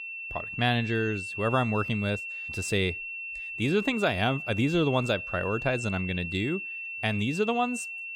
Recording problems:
high-pitched whine; loud; throughout; 2.5 kHz, 6 dB below the speech

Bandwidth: 17.5 kHz